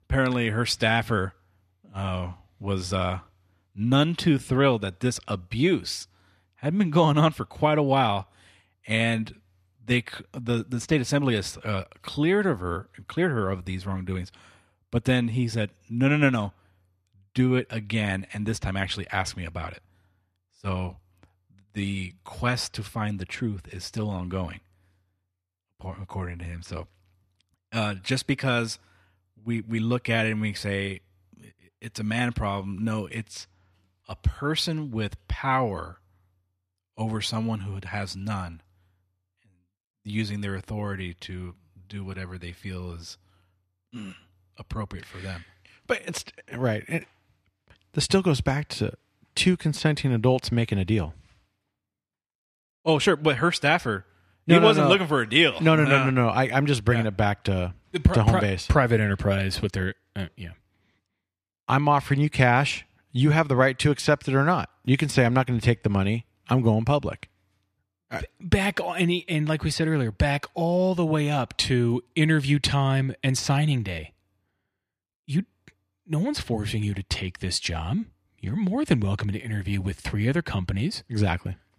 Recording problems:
none

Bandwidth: 14.5 kHz